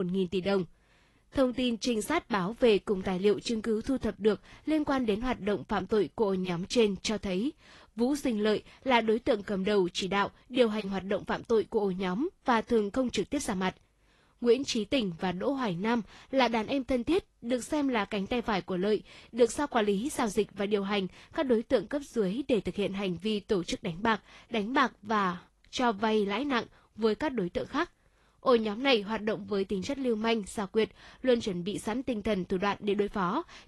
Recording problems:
garbled, watery; slightly; nothing above 11.5 kHz
abrupt cut into speech; at the start

